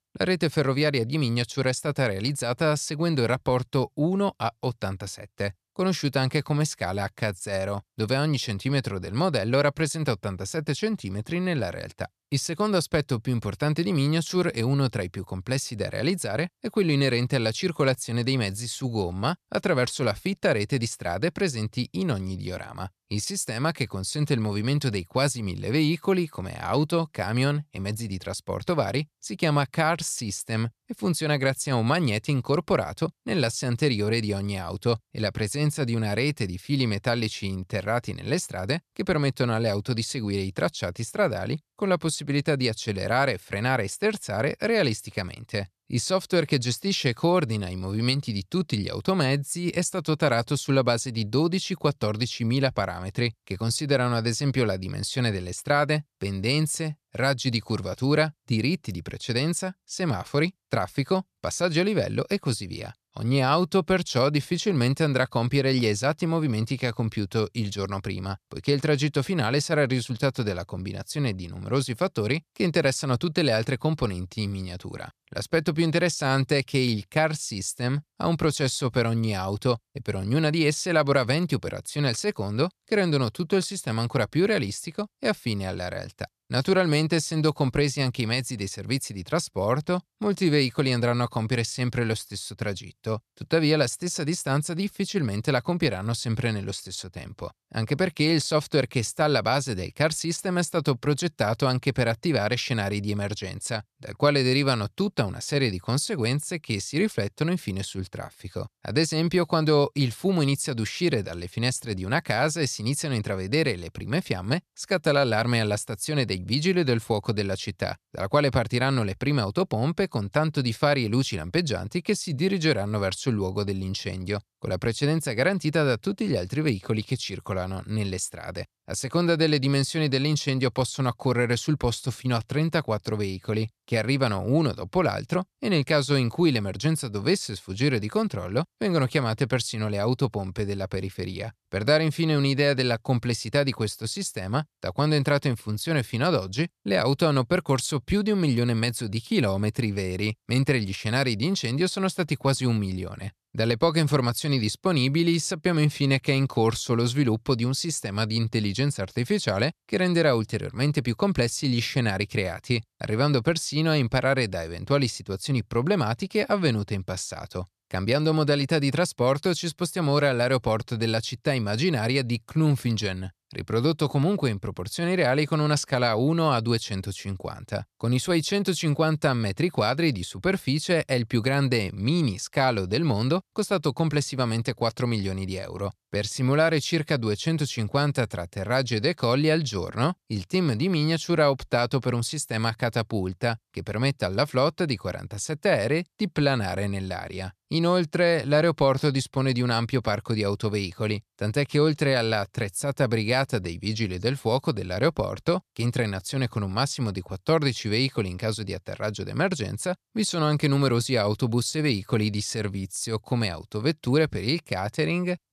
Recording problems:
none

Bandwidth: 14 kHz